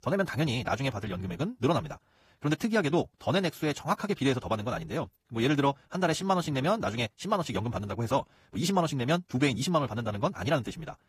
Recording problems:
wrong speed, natural pitch; too fast; 1.5 times normal speed
garbled, watery; slightly; nothing above 14.5 kHz

